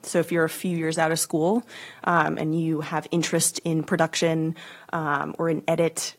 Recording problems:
garbled, watery; slightly

